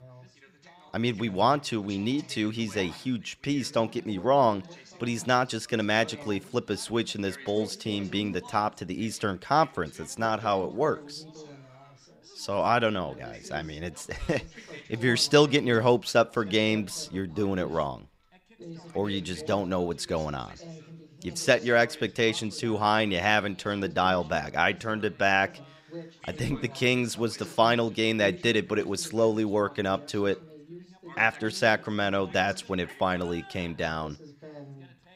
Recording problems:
background chatter; noticeable; throughout; 3 voices, 20 dB below the speech

